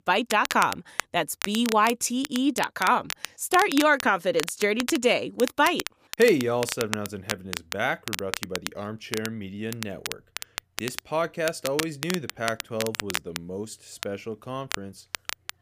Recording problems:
crackle, like an old record; loud; 8 dB below the speech

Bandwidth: 15 kHz